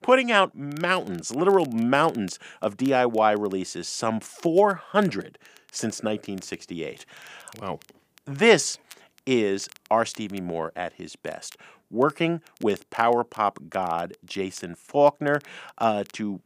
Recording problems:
crackle, like an old record; faint; 30 dB below the speech

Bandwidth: 15 kHz